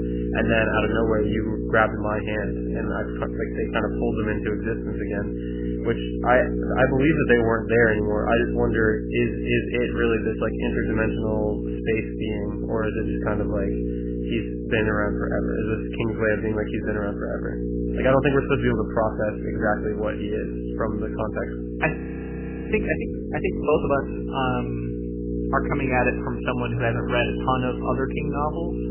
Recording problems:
garbled, watery; badly; nothing above 3 kHz
electrical hum; loud; throughout; 60 Hz, 7 dB below the speech
audio freezing; at 22 s for 1 s

